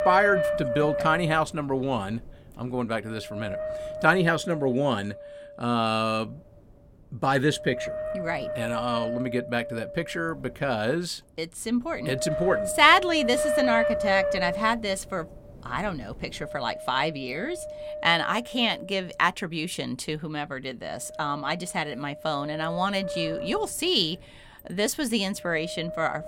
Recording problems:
wind noise on the microphone; heavy; 5 dB below the speech

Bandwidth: 16.5 kHz